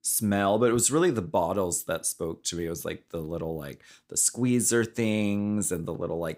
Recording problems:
none

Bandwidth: 15.5 kHz